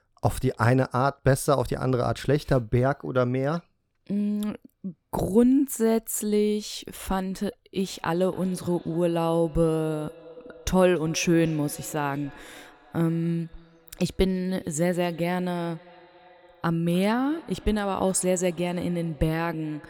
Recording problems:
echo of what is said; faint; from 8 s on; 290 ms later, 25 dB below the speech

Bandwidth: 18.5 kHz